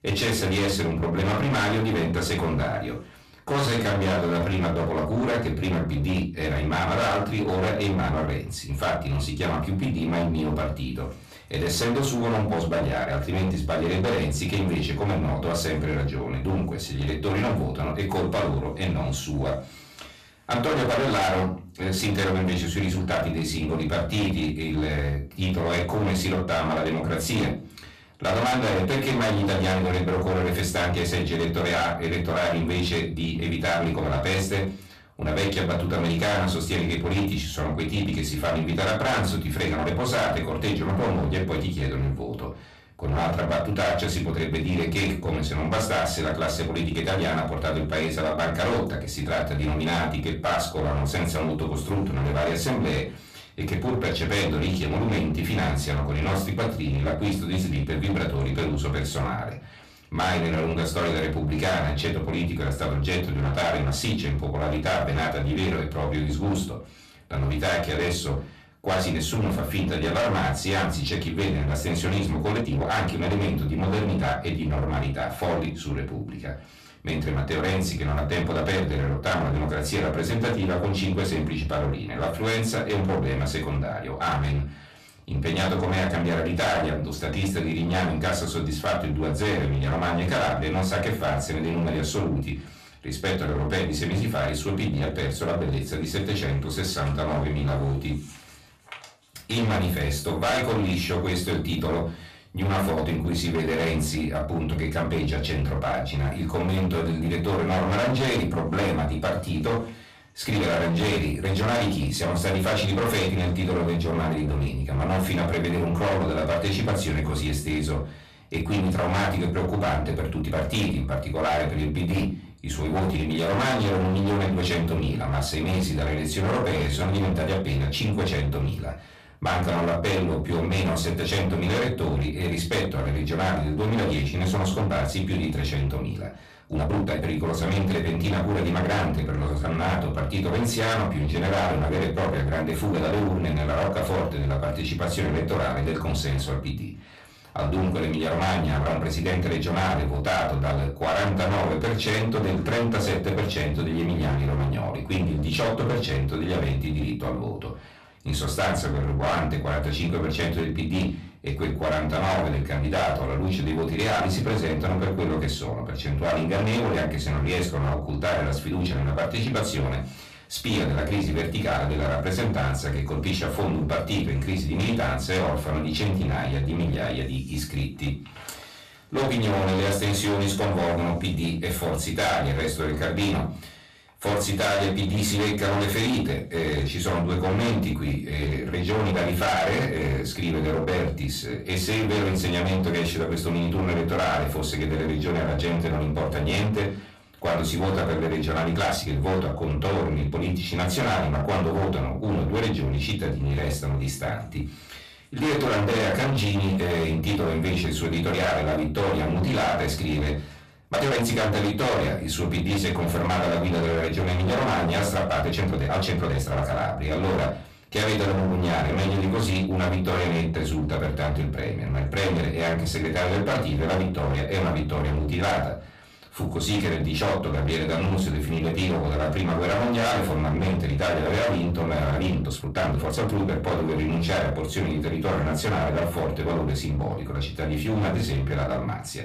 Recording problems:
distortion; heavy; 26% of the sound clipped
off-mic speech; far
room echo; very slight; dies away in 0.3 s
uneven, jittery; strongly; from 3.5 s to 3:53

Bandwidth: 14 kHz